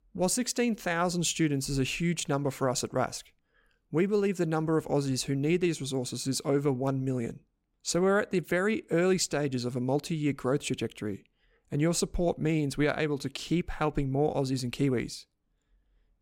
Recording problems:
none

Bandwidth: 16 kHz